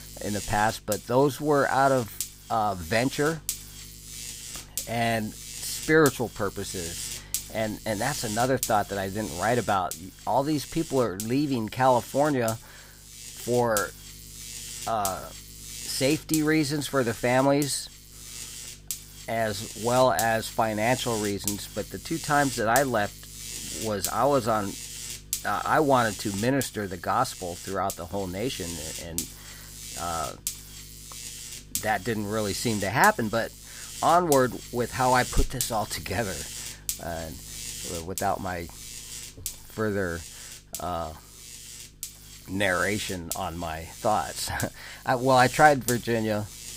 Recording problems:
electrical hum; noticeable; throughout; 50 Hz, 10 dB below the speech

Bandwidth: 15.5 kHz